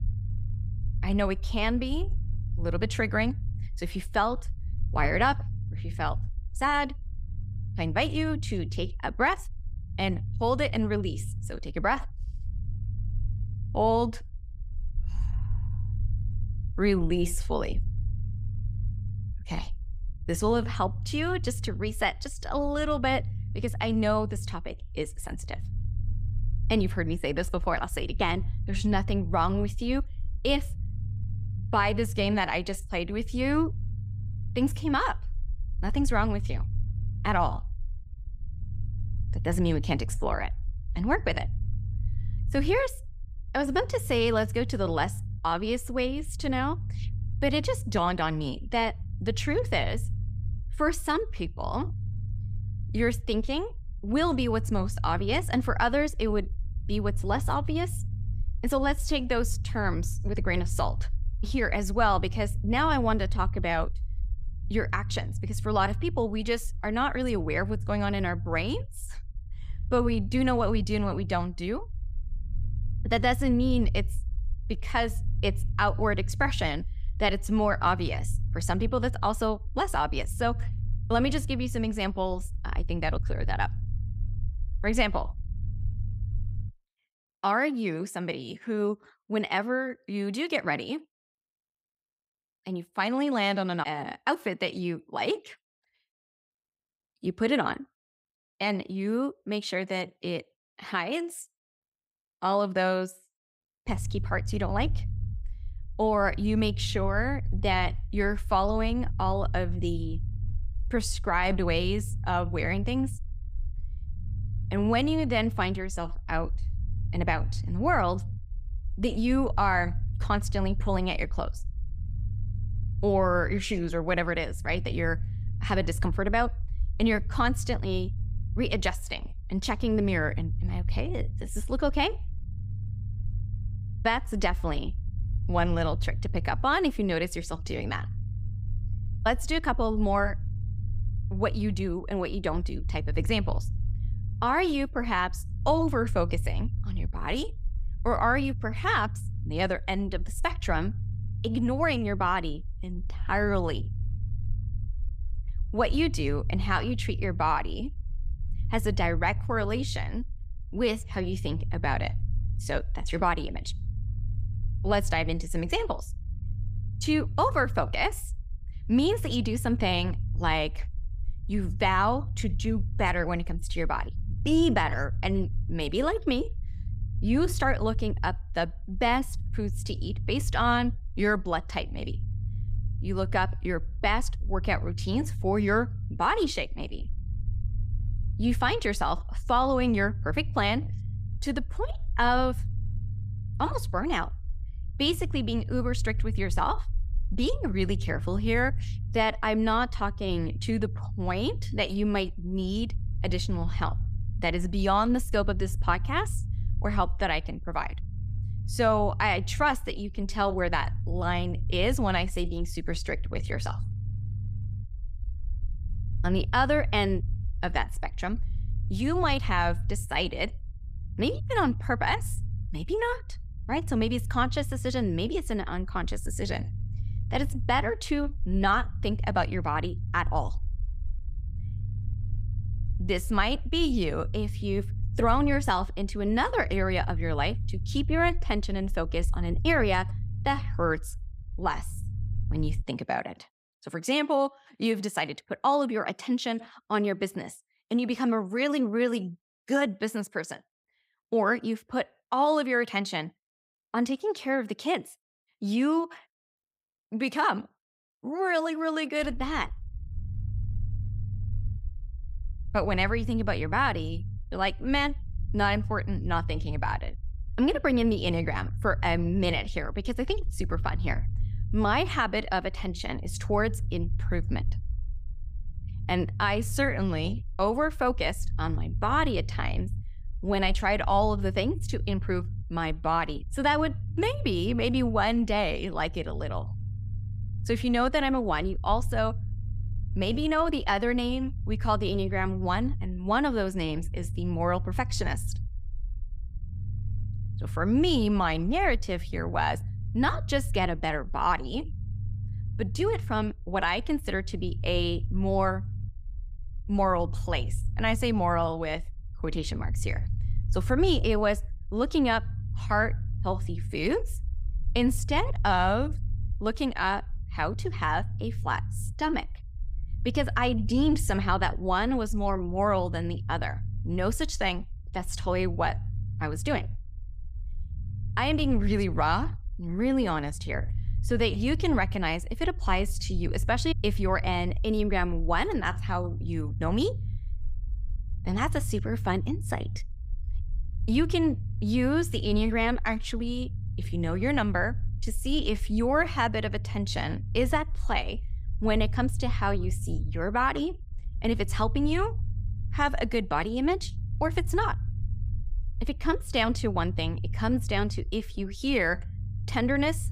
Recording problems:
low rumble; faint; until 1:27, from 1:44 to 4:03 and from 4:19 on; 20 dB below the speech

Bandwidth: 15.5 kHz